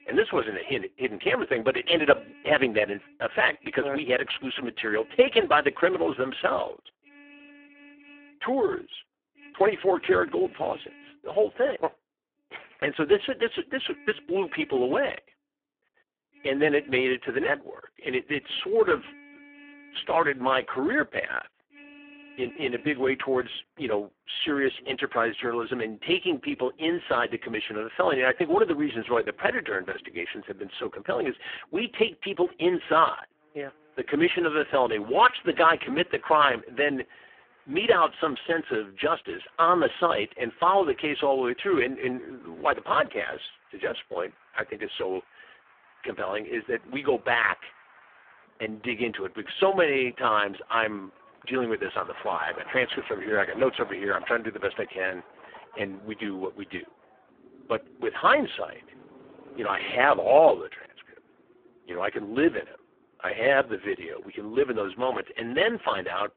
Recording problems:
phone-call audio; poor line
traffic noise; faint; throughout; 25 dB below the speech

